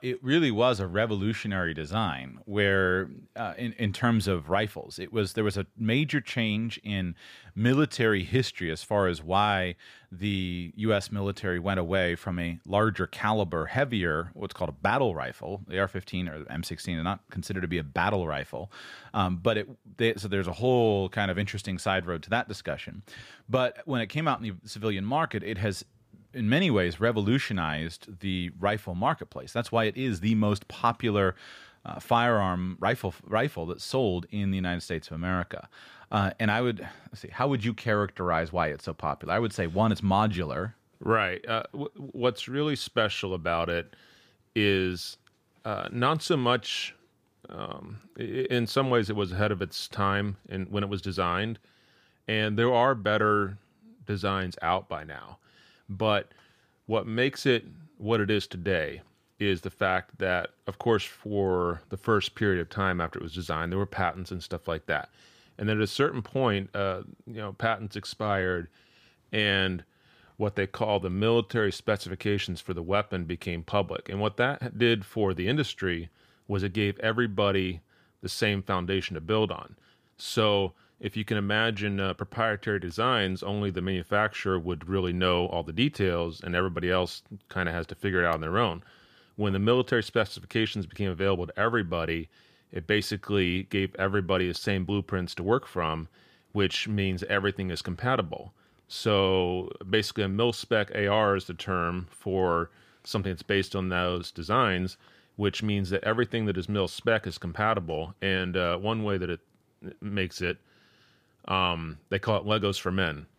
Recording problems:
none

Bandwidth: 15 kHz